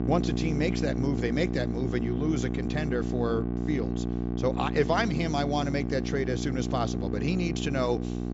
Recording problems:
high frequencies cut off; noticeable; nothing above 8 kHz
electrical hum; loud; throughout; 60 Hz, 6 dB below the speech

